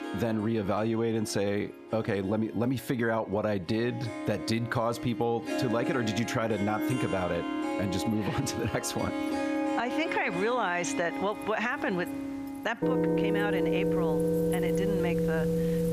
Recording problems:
squashed, flat; somewhat, background pumping
background music; loud; throughout; 1 dB below the speech
household noises; faint; throughout; 25 dB below the speech

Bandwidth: 14.5 kHz